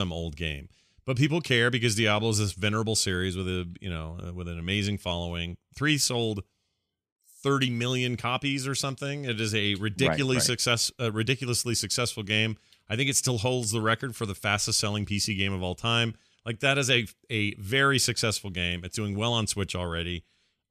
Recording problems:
abrupt cut into speech; at the start

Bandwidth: 14.5 kHz